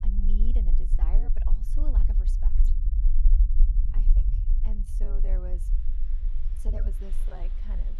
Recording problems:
low rumble; loud; throughout; 4 dB below the speech
traffic noise; noticeable; from 6 s on; 15 dB below the speech
uneven, jittery; strongly; from 0.5 to 7.5 s

